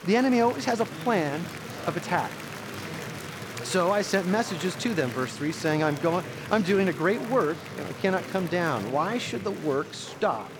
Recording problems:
murmuring crowd; noticeable; throughout; 10 dB below the speech

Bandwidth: 17.5 kHz